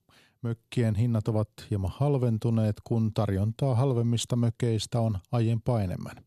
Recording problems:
none

